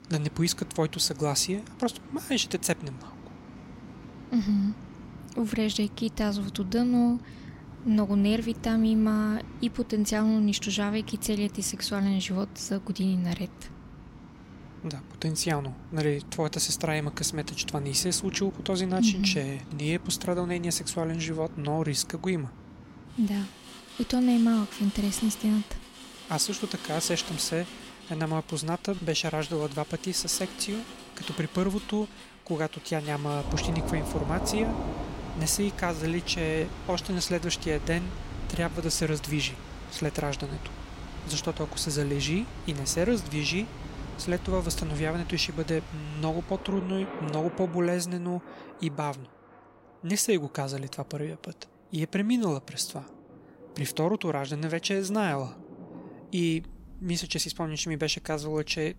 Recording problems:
rain or running water; noticeable; throughout; 15 dB below the speech

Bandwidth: 16 kHz